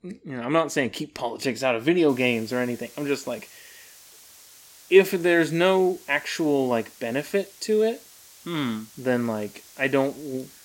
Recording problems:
hiss; faint; from 2 s on; 20 dB below the speech

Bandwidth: 16.5 kHz